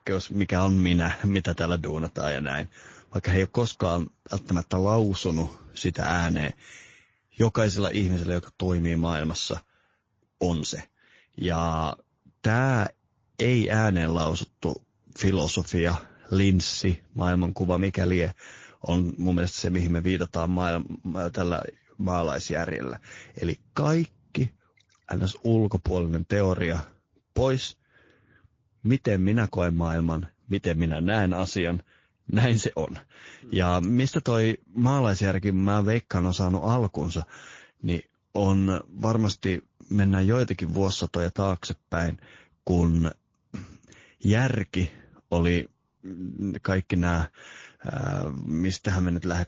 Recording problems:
garbled, watery; slightly; nothing above 19.5 kHz

